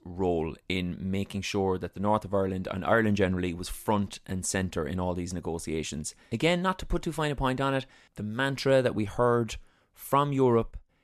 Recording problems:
none

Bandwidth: 13.5 kHz